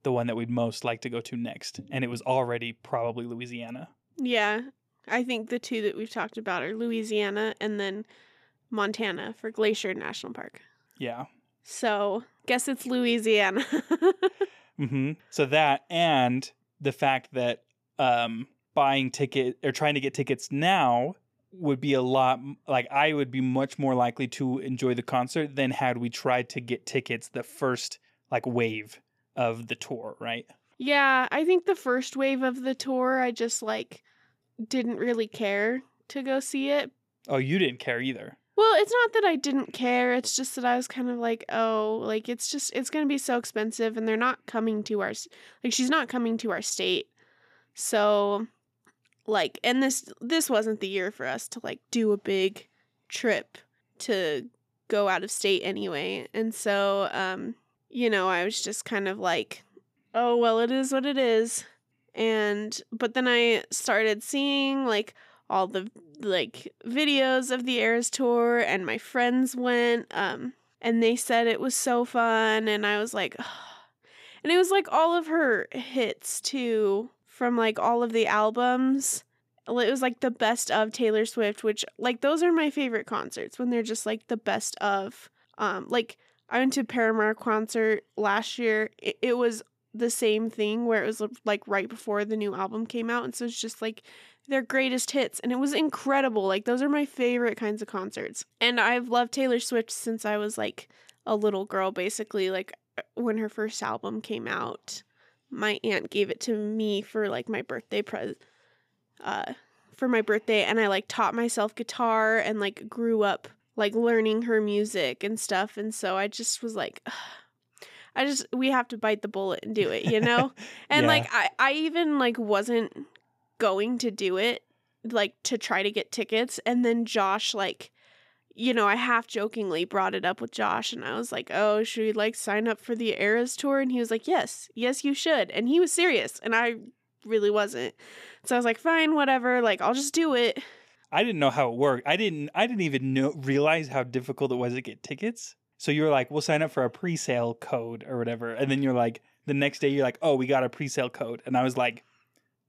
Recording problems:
none

